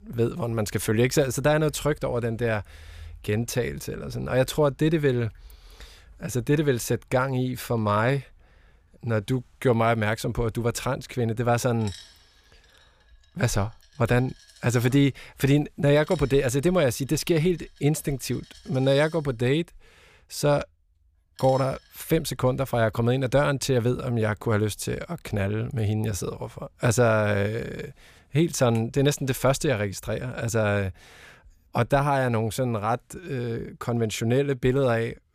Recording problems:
household noises; faint; throughout; 25 dB below the speech

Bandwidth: 15 kHz